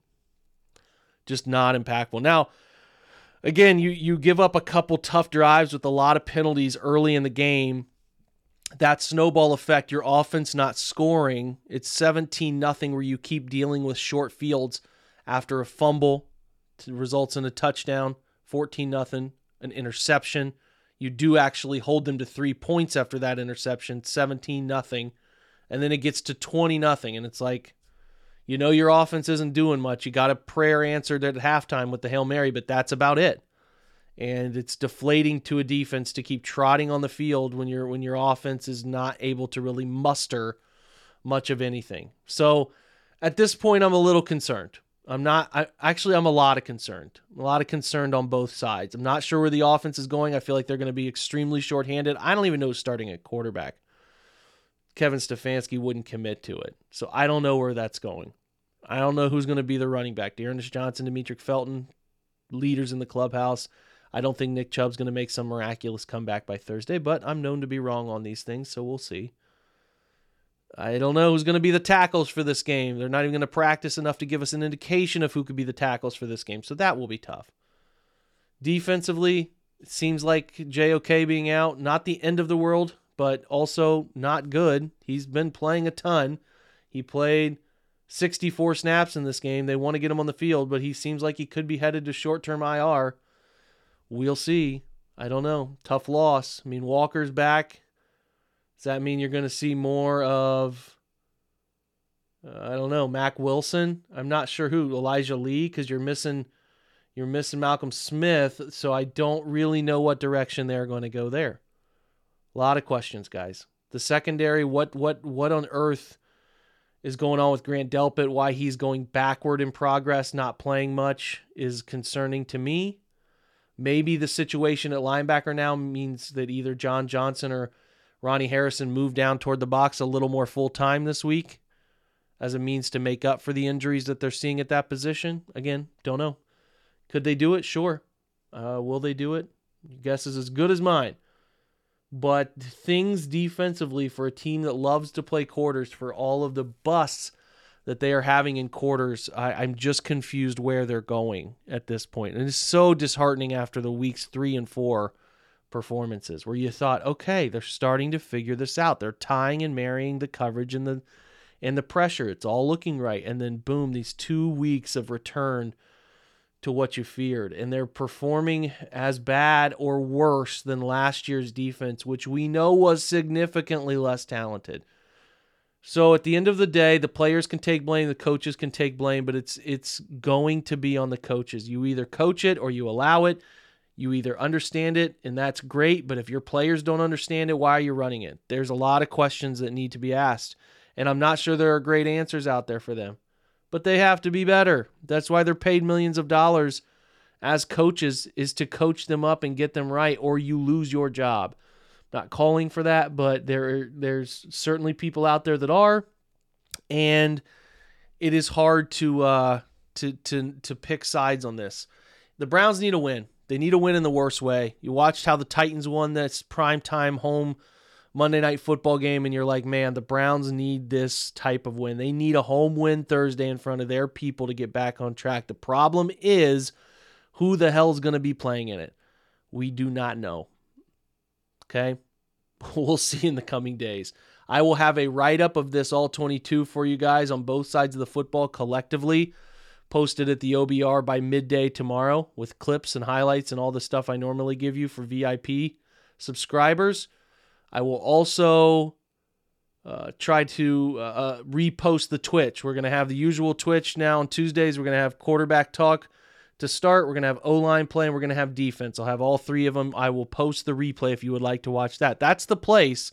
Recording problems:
none

